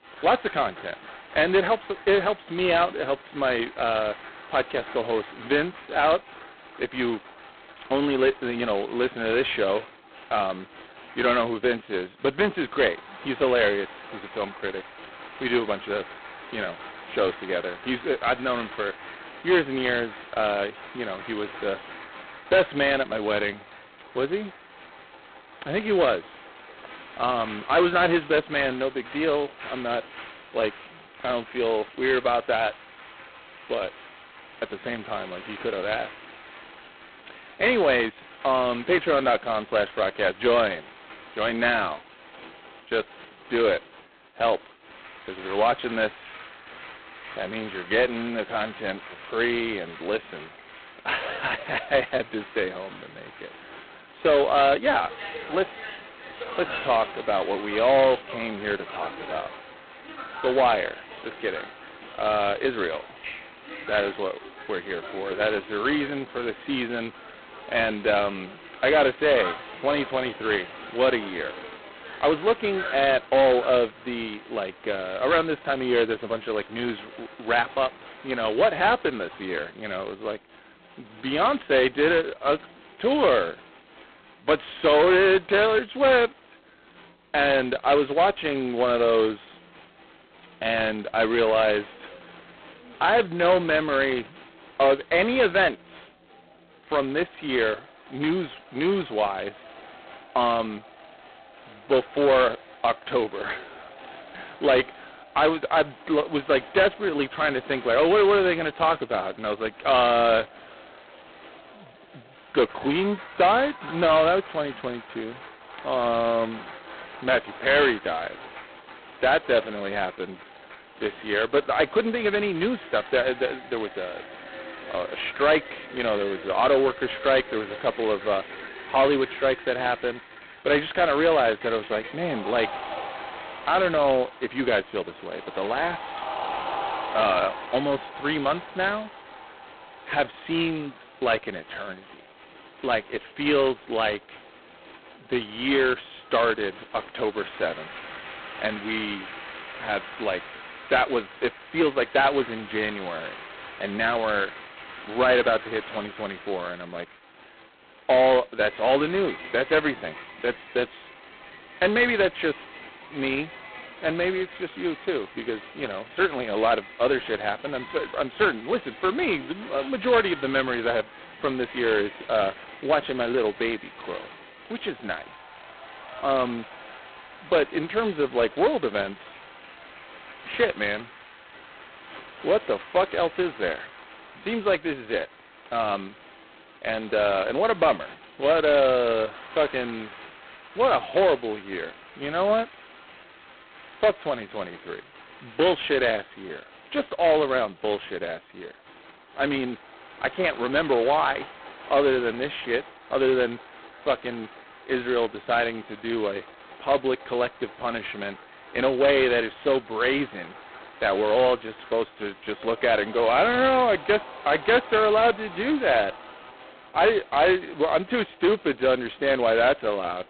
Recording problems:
phone-call audio; poor line; nothing above 4 kHz
distortion; slight; 3% of the sound clipped
crowd noise; noticeable; throughout; 15 dB below the speech

